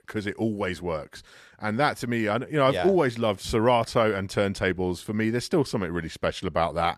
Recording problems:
none

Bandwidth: 13.5 kHz